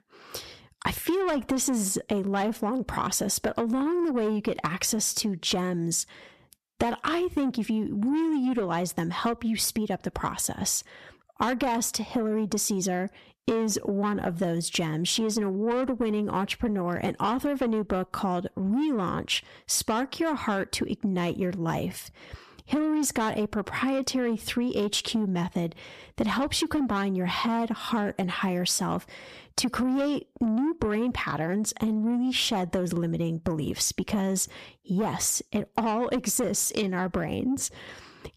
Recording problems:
distortion; slight; 10 dB below the speech
squashed, flat; somewhat

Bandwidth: 14.5 kHz